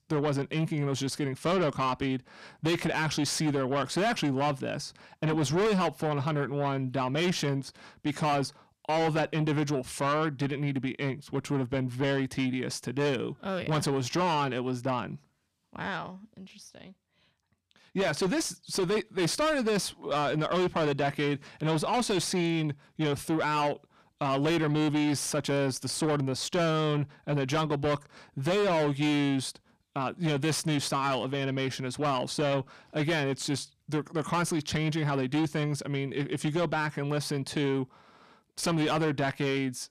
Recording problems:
distortion; heavy; 7 dB below the speech

